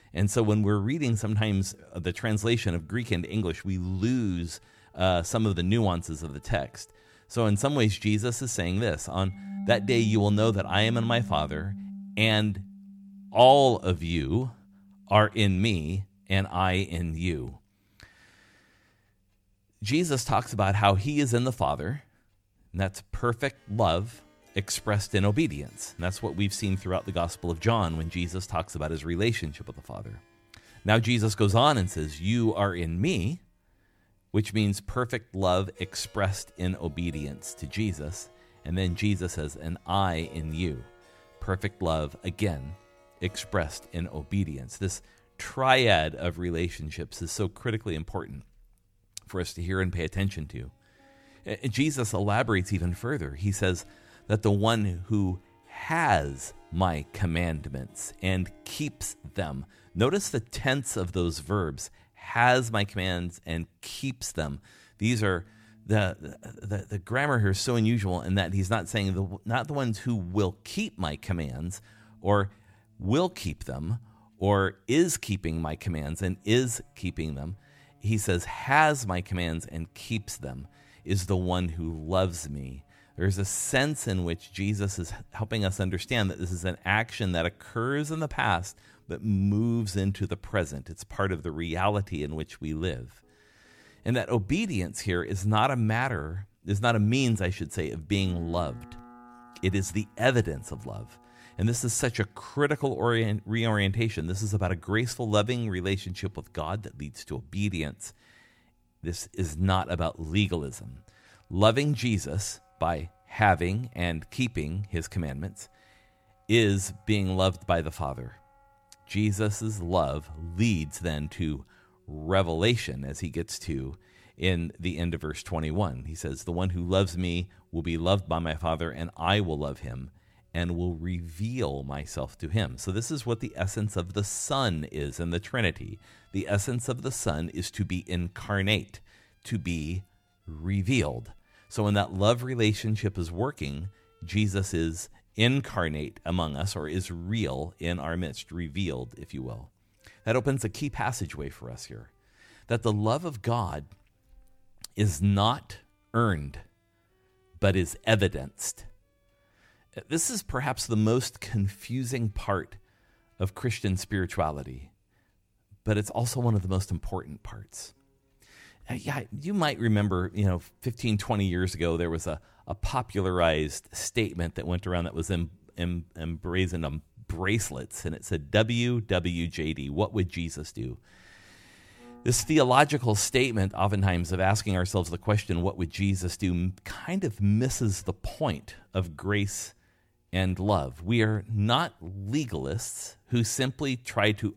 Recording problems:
background music; faint; throughout; 20 dB below the speech

